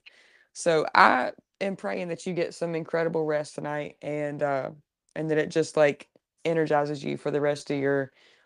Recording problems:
none

